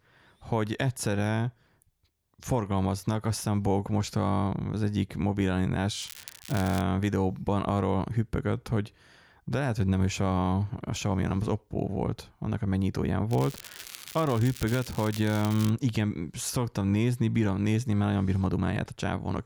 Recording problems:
crackling; noticeable; at 6 s and from 13 to 16 s; 15 dB below the speech

